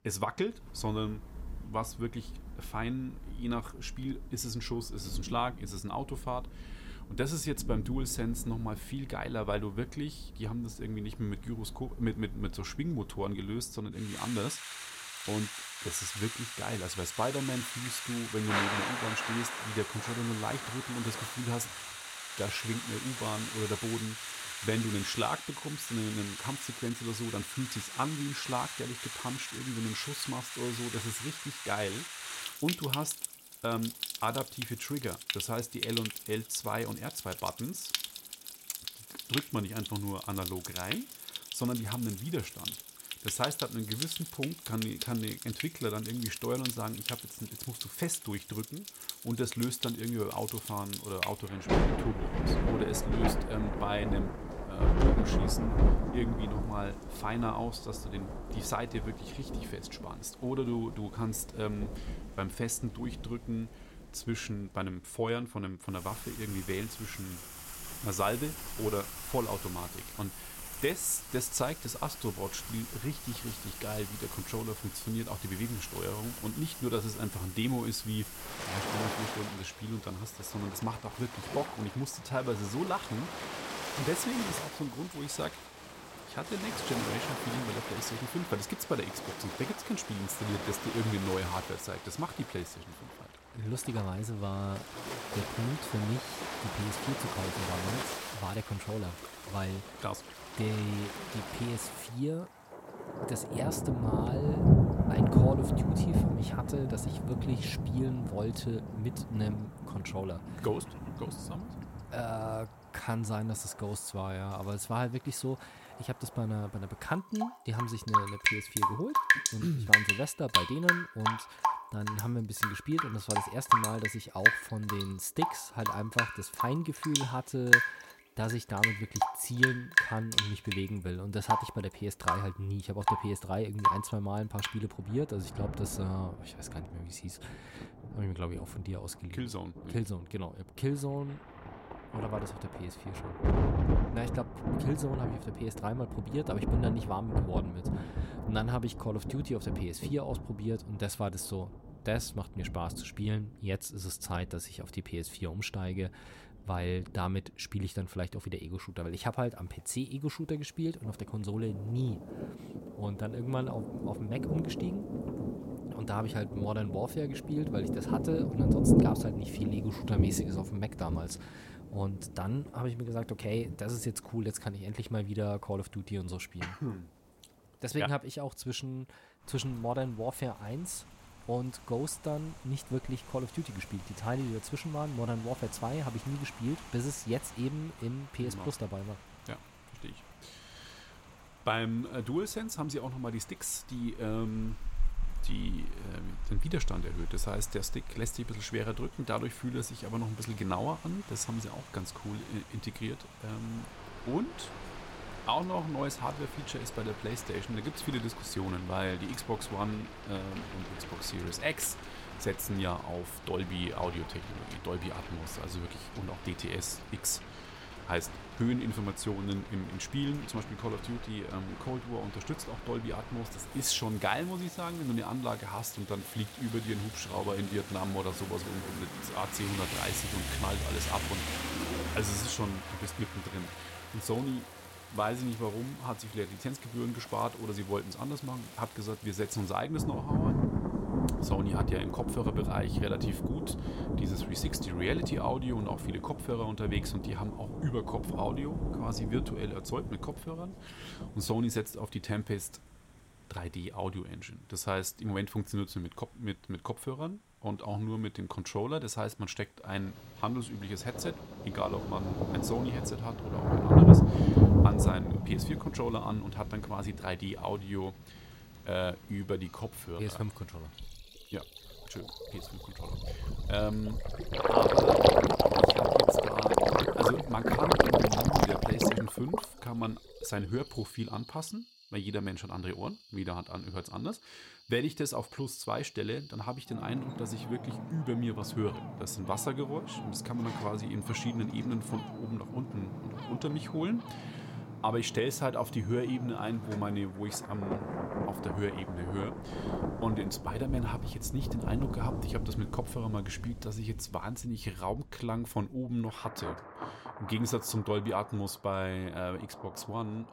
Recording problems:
rain or running water; very loud; throughout; 3 dB above the speech

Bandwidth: 16.5 kHz